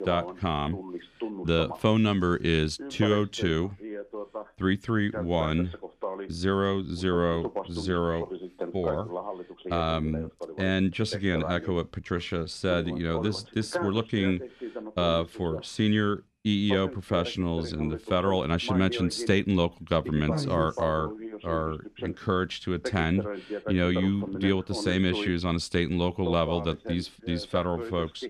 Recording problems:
voice in the background; loud; throughout; 10 dB below the speech

